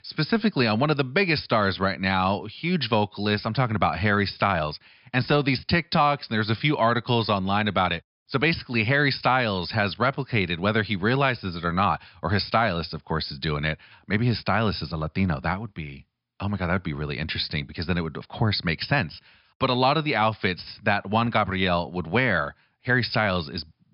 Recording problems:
high frequencies cut off; noticeable; nothing above 5.5 kHz

